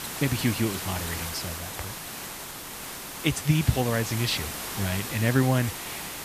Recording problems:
hiss; loud; throughout; 6 dB below the speech
machinery noise; very faint; throughout; 25 dB below the speech

